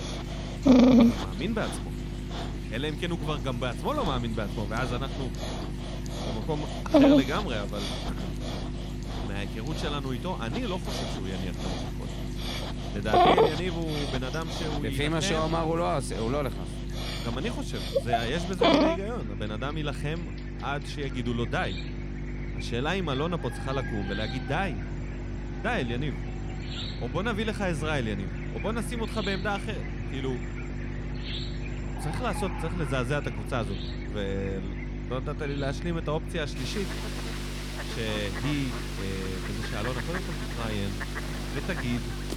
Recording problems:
animal sounds; very loud; throughout; 1 dB above the speech
electrical hum; noticeable; throughout; 50 Hz, 15 dB below the speech

